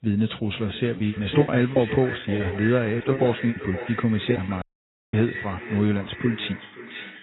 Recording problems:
echo of what is said; strong; throughout; 520 ms later, 10 dB below the speech
garbled, watery; badly; nothing above 4 kHz
choppy; very; from 1 to 4.5 s; 15% of the speech affected
audio cutting out; at 4.5 s for 0.5 s

